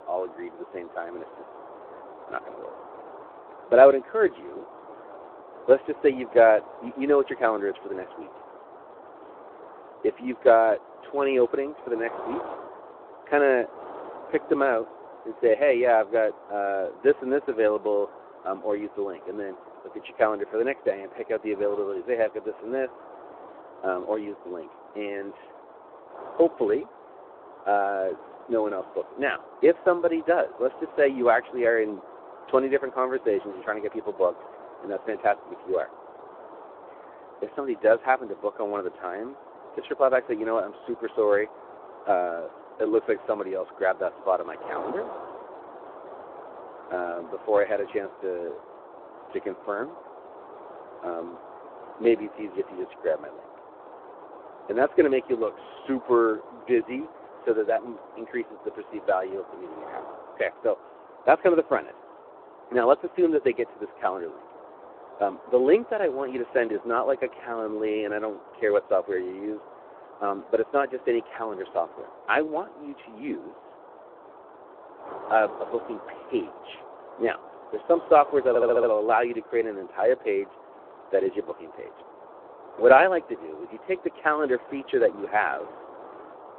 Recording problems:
phone-call audio; nothing above 3.5 kHz
muffled; very slightly; fading above 1 kHz
wind noise on the microphone; occasional gusts; 20 dB below the speech
audio stuttering; at 1:18

